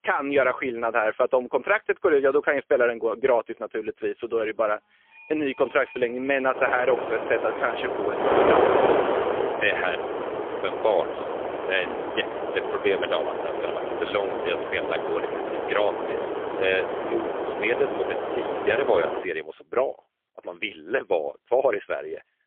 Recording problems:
phone-call audio; poor line; nothing above 3.5 kHz
wind noise on the microphone; heavy; from 6.5 to 19 s; 2 dB below the speech
alarms or sirens; faint; until 8 s; 20 dB below the speech

